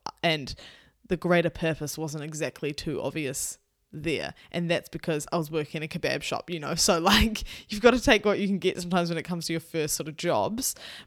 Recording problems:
none

